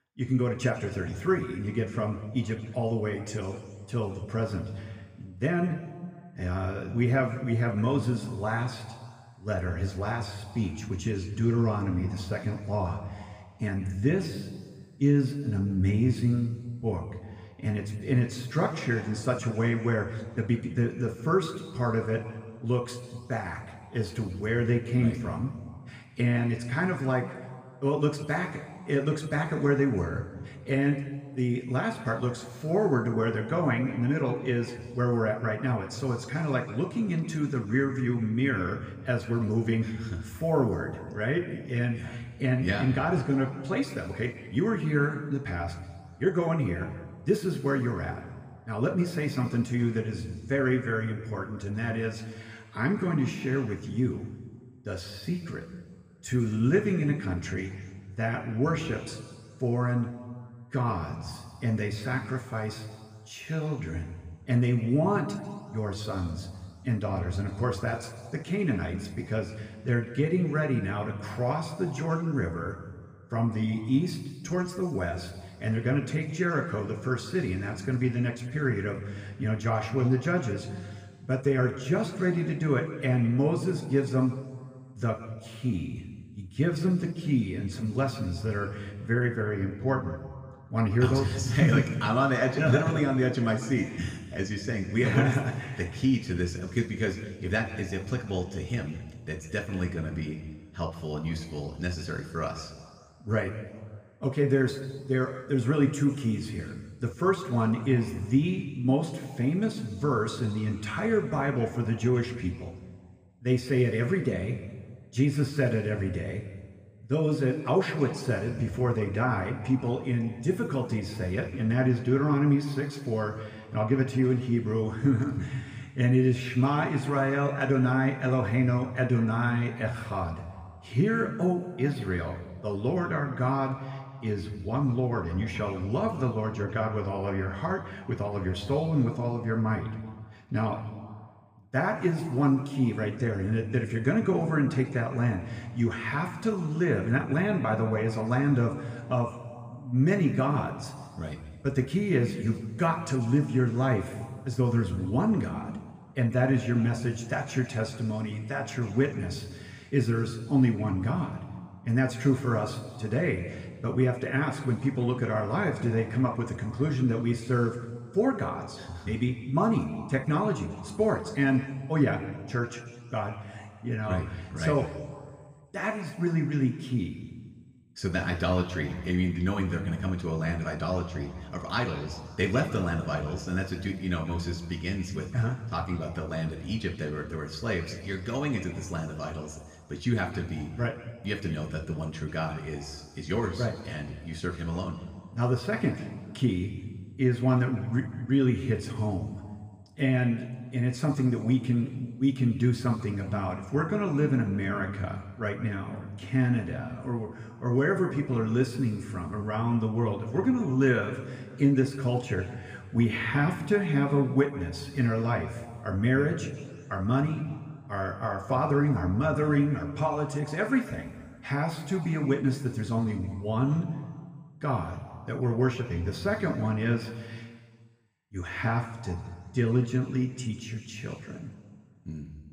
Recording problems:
room echo; noticeable; dies away in 1.7 s
off-mic speech; somewhat distant

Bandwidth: 15 kHz